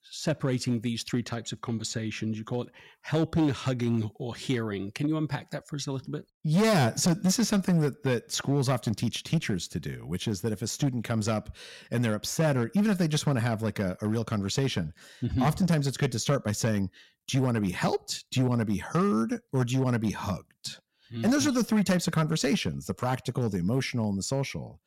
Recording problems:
distortion; slight; 5% of the sound clipped

